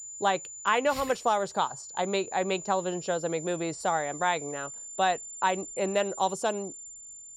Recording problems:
high-pitched whine; noticeable; throughout; 7 kHz, 10 dB below the speech

